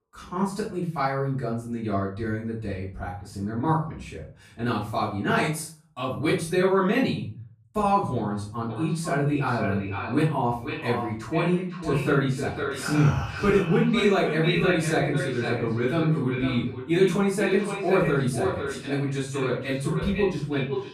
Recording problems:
echo of what is said; strong; from 8.5 s on; 500 ms later, 7 dB below the speech
off-mic speech; far
room echo; noticeable; dies away in 0.4 s

